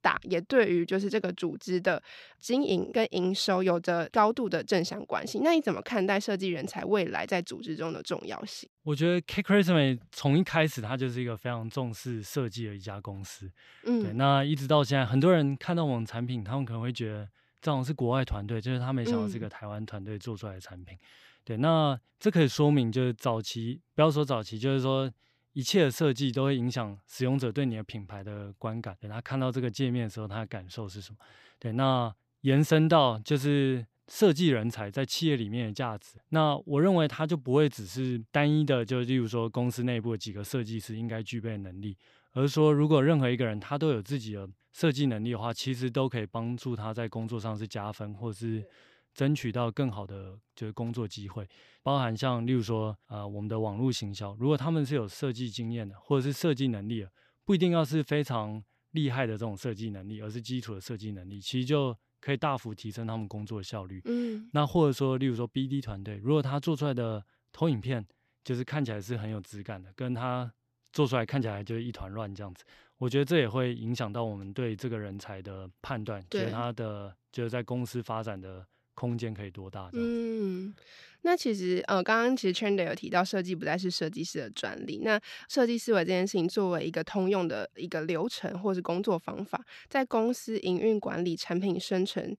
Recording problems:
none

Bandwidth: 14 kHz